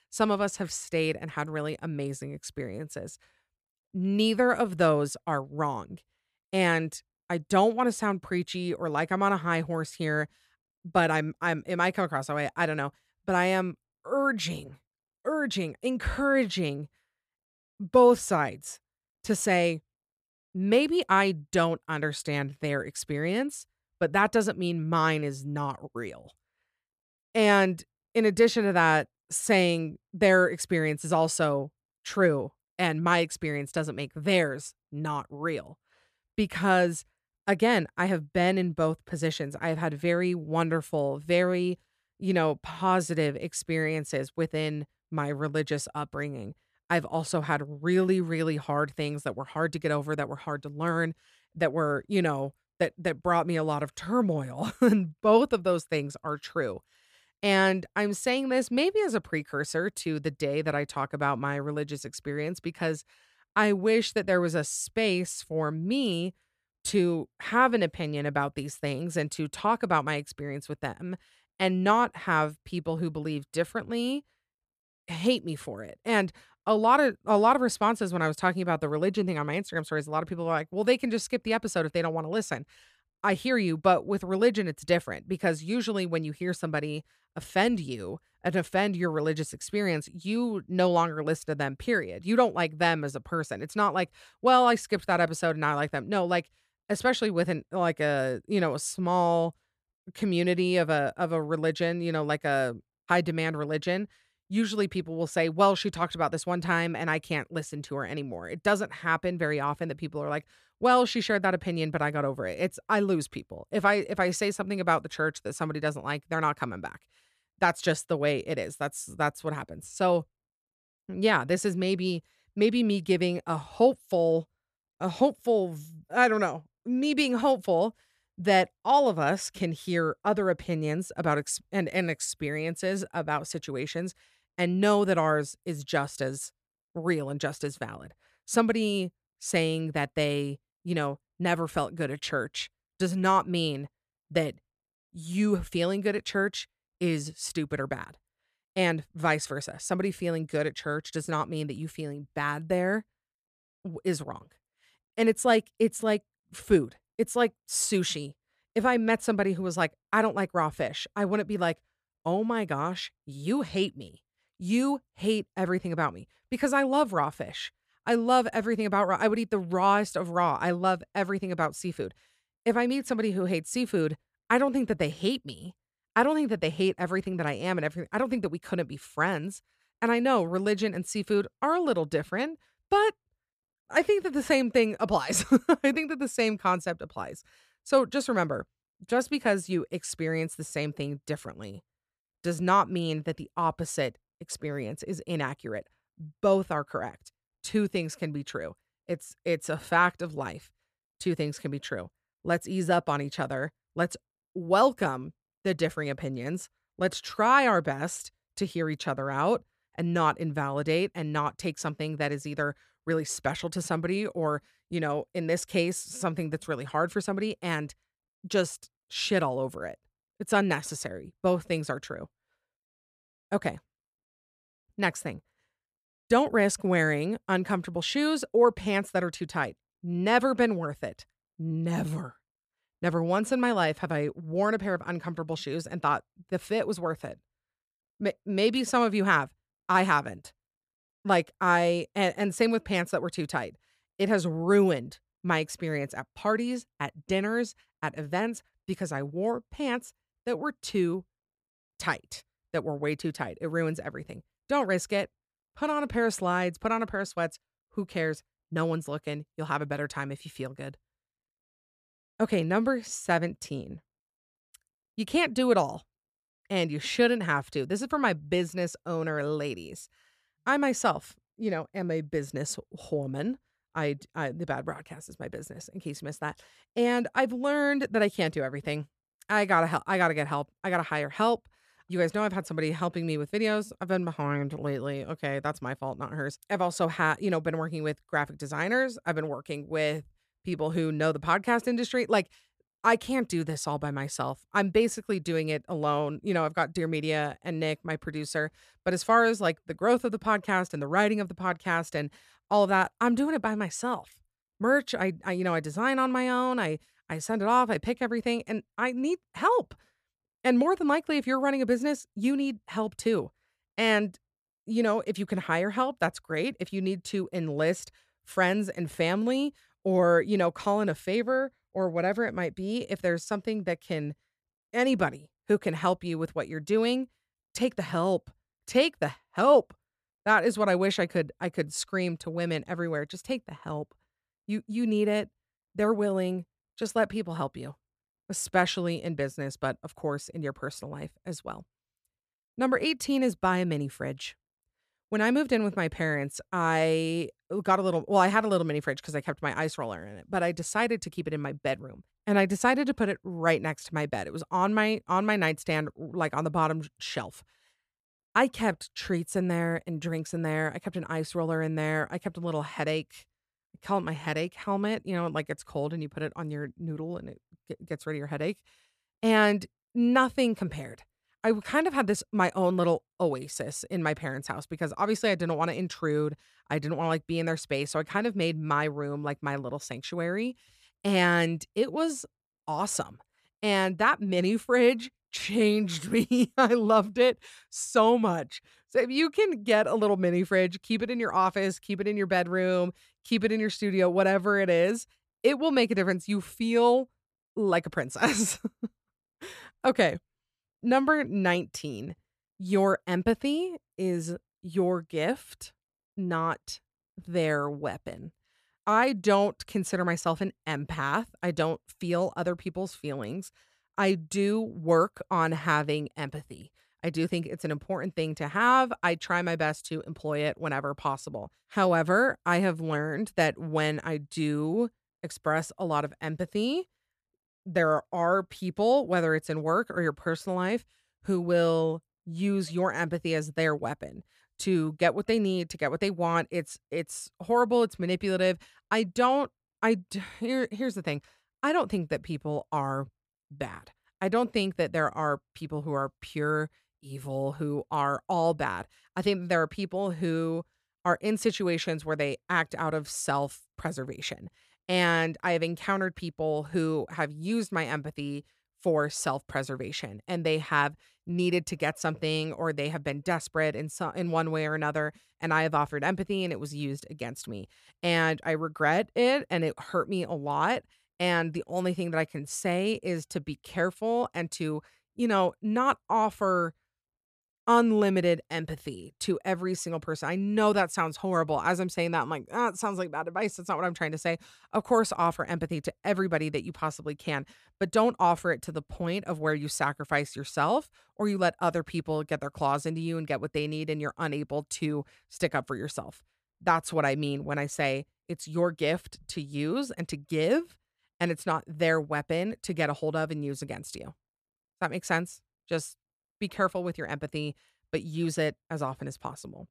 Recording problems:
none

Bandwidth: 14.5 kHz